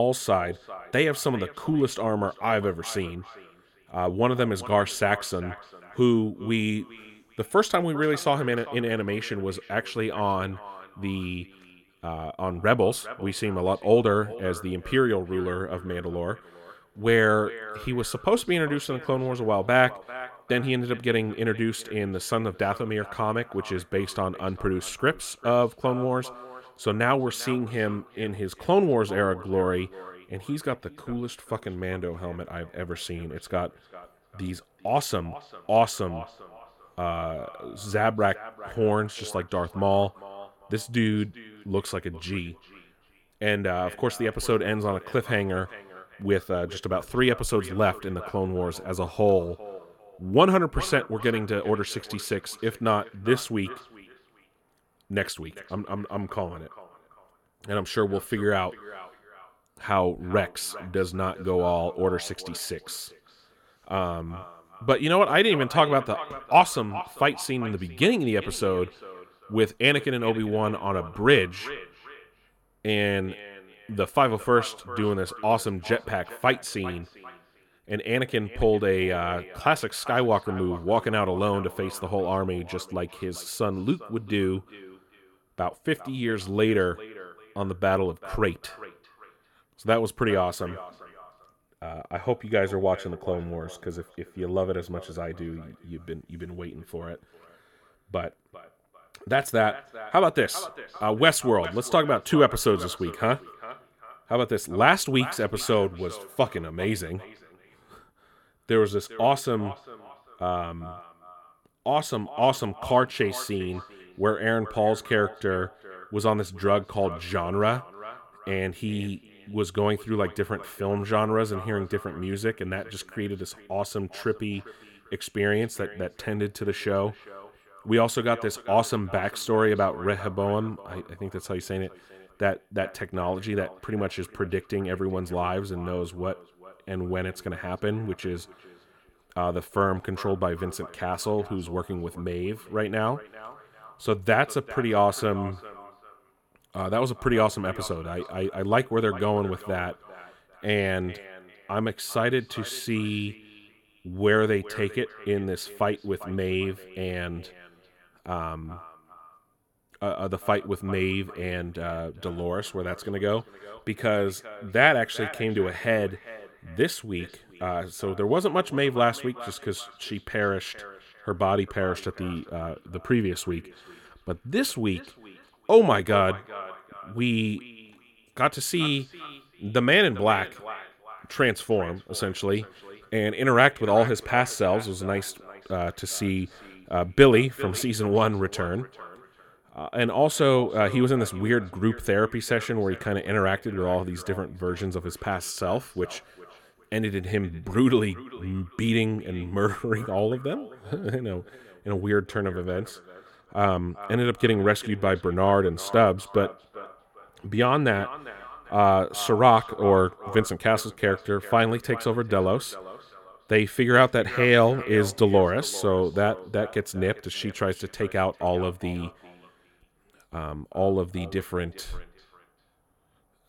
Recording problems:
echo of what is said; noticeable; throughout; 400 ms later, 20 dB below the speech
abrupt cut into speech; at the start

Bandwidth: 17 kHz